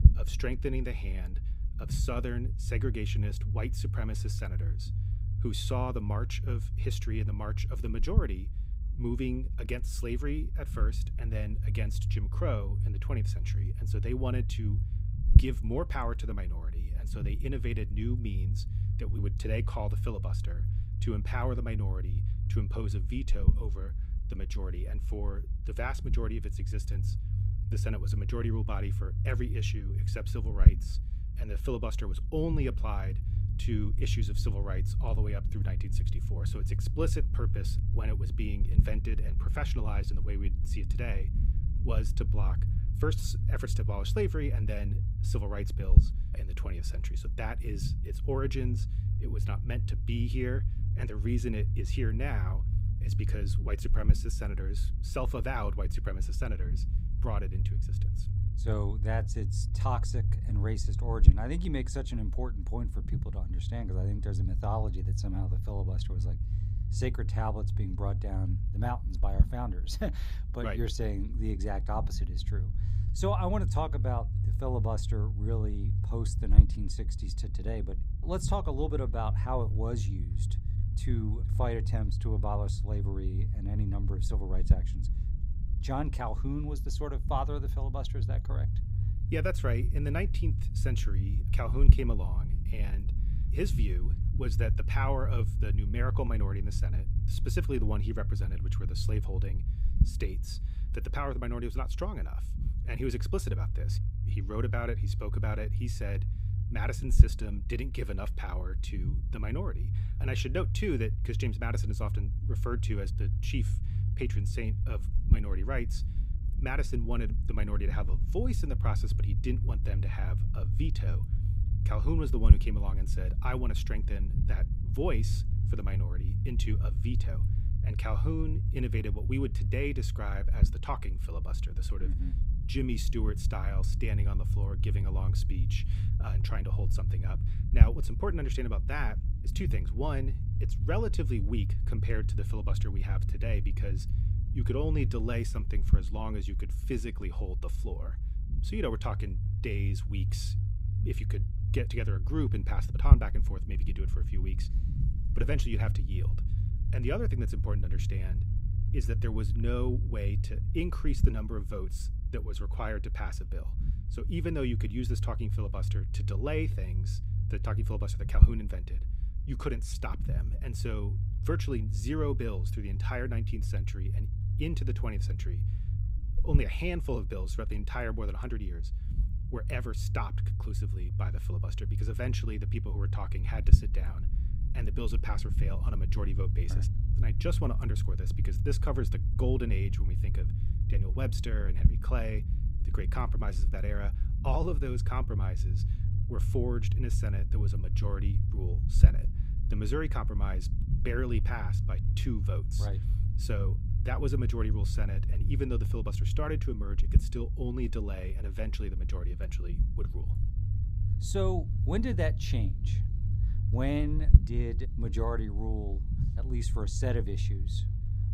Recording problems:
low rumble; loud; throughout; 8 dB below the speech

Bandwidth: 15.5 kHz